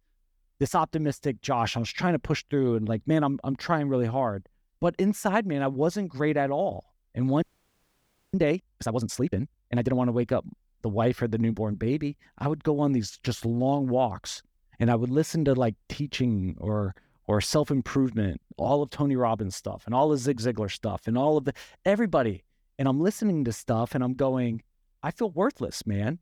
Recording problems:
audio freezing; at 7.5 s for 1 s

